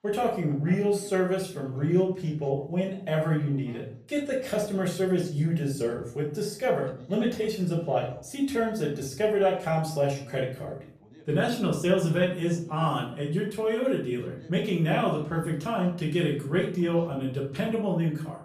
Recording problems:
off-mic speech; far
room echo; slight; dies away in 0.4 s
voice in the background; faint; throughout; 25 dB below the speech

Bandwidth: 14.5 kHz